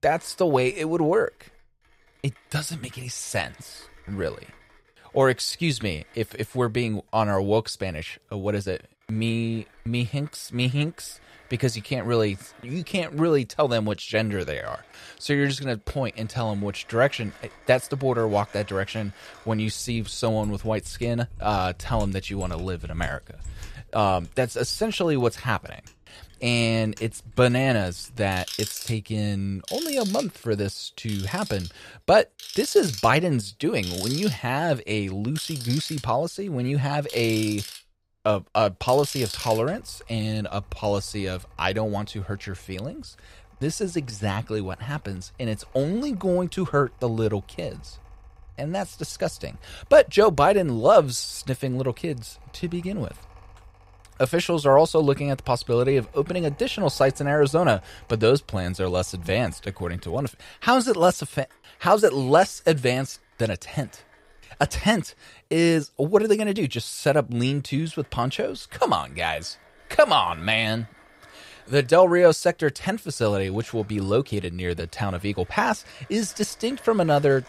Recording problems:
machinery noise; noticeable; throughout; 15 dB below the speech

